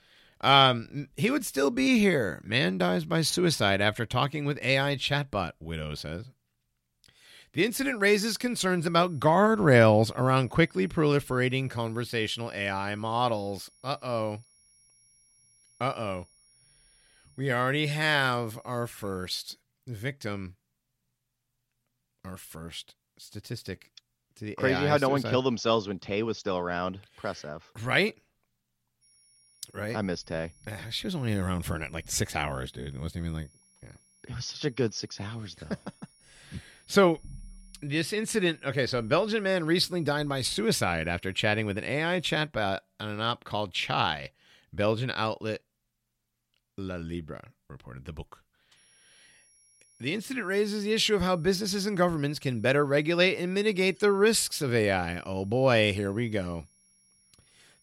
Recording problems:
high-pitched whine; faint; from 8 to 19 s, from 29 to 42 s and from 49 s on; 10.5 kHz, 35 dB below the speech

